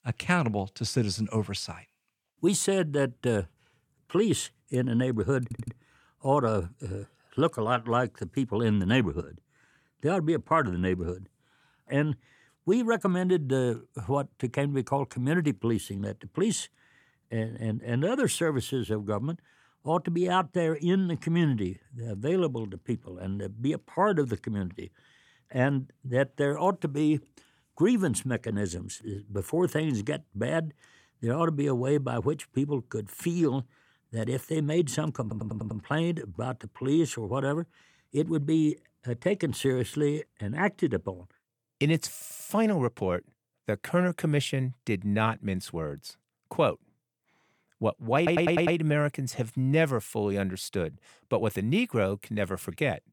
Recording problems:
audio stuttering; 4 times, first at 5.5 s

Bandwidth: 18.5 kHz